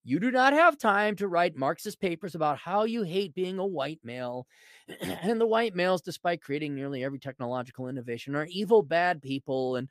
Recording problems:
none

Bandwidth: 14.5 kHz